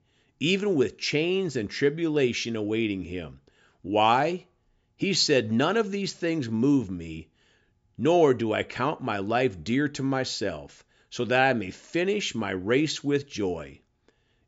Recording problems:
high frequencies cut off; noticeable; nothing above 7.5 kHz

